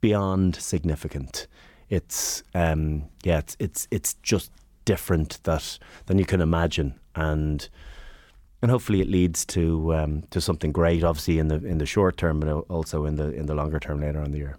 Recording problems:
none

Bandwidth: 18.5 kHz